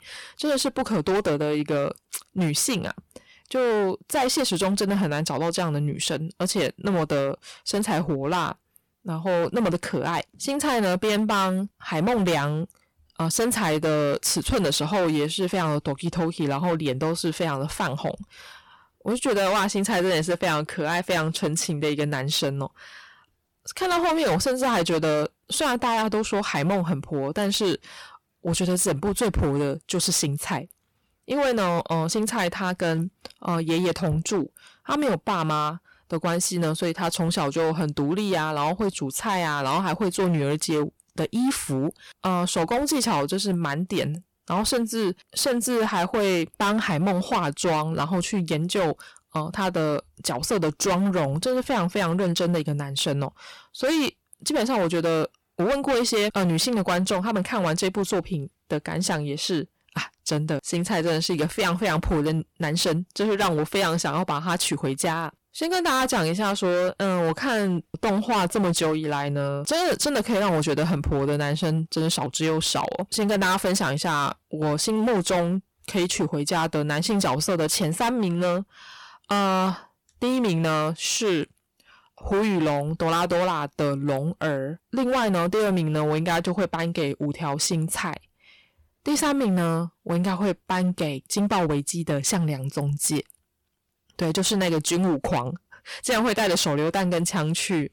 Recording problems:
distortion; heavy; 17% of the sound clipped

